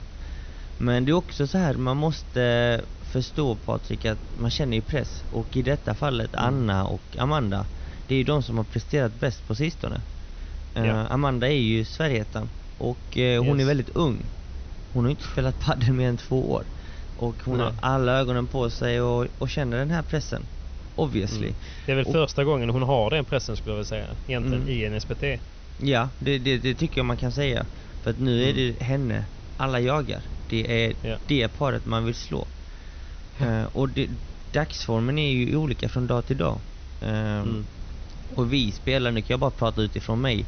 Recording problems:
high frequencies cut off; noticeable; nothing above 6 kHz
hiss; faint; throughout; 25 dB below the speech
low rumble; faint; throughout; 25 dB below the speech

